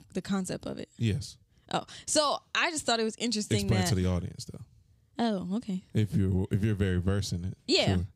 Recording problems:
none

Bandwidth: 15.5 kHz